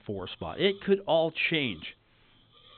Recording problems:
high frequencies cut off; severe; nothing above 4 kHz
hiss; faint; throughout; 30 dB below the speech

